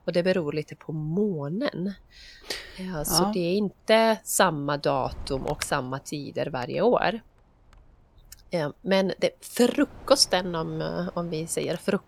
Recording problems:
wind noise on the microphone; occasional gusts; 20 dB below the speech

